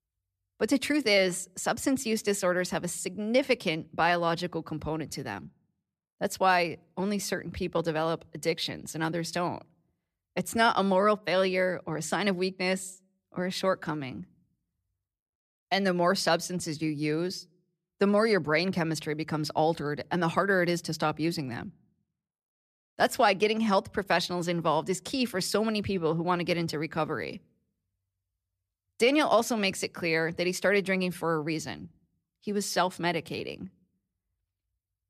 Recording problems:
none

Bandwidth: 14.5 kHz